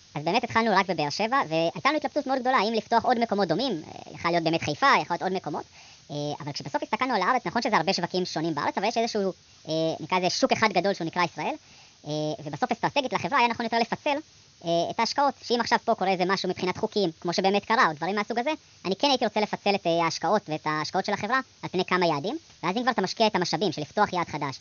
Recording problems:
wrong speed and pitch; too fast and too high; 1.5 times normal speed
high frequencies cut off; noticeable; nothing above 6.5 kHz
hiss; faint; throughout; 25 dB below the speech

